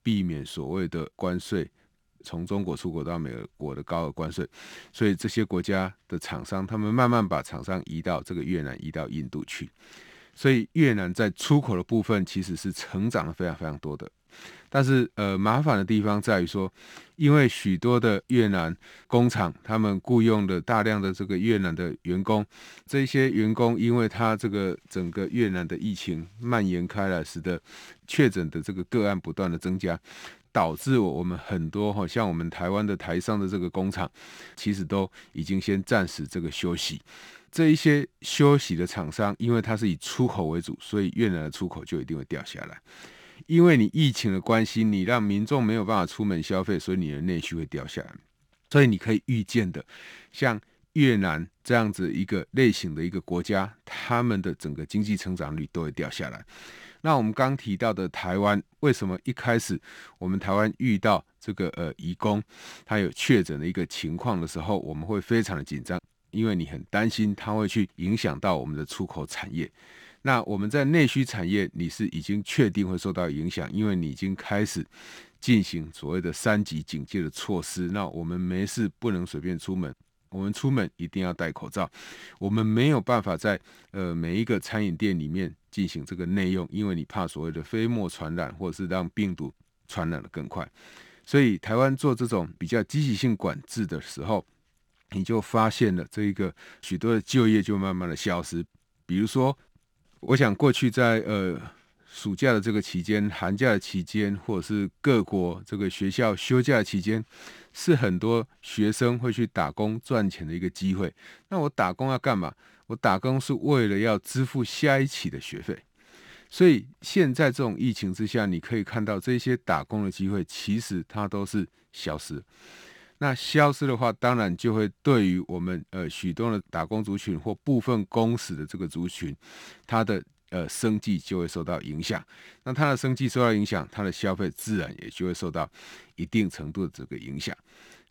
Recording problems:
none

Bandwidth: 18.5 kHz